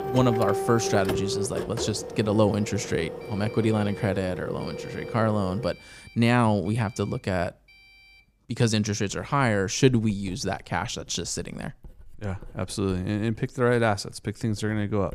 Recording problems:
household noises; loud; throughout; 7 dB below the speech

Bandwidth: 15 kHz